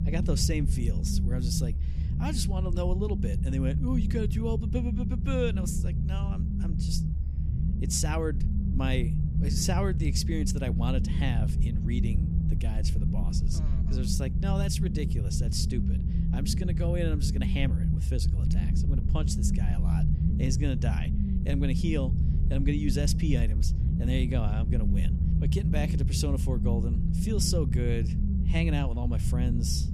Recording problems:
low rumble; loud; throughout; 5 dB below the speech

